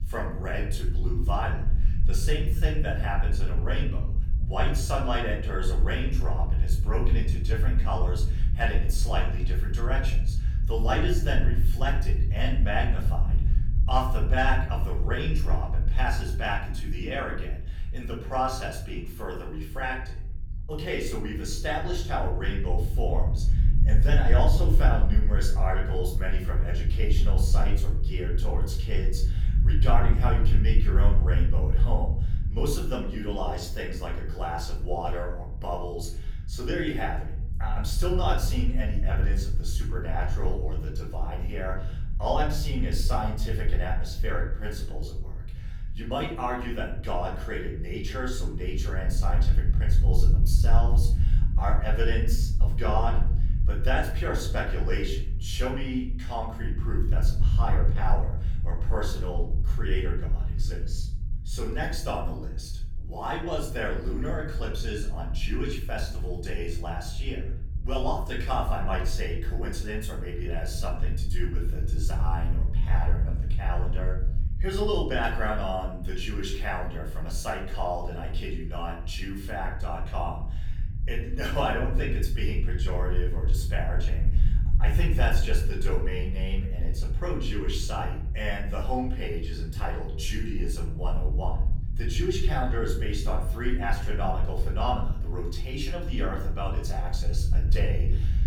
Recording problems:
off-mic speech; far
room echo; slight; dies away in 0.5 s
low rumble; noticeable; throughout; 15 dB below the speech

